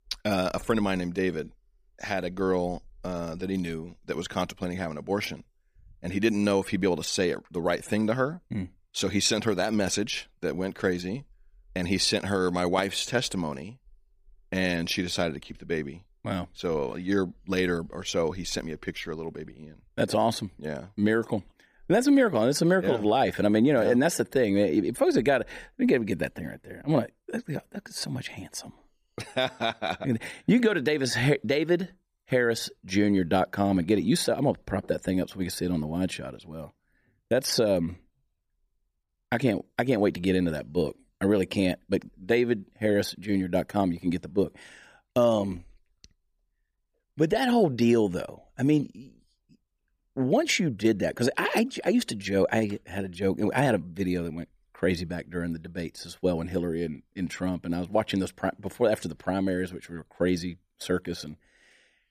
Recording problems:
none

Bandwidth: 15 kHz